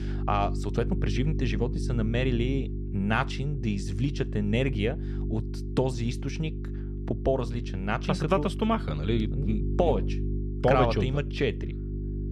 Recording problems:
electrical hum; noticeable; throughout; 50 Hz, 10 dB below the speech

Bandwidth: 14 kHz